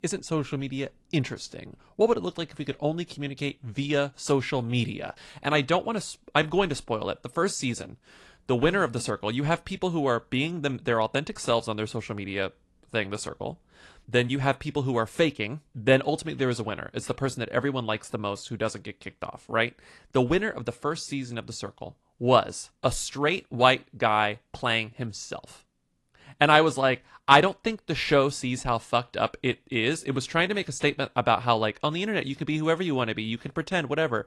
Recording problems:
garbled, watery; slightly

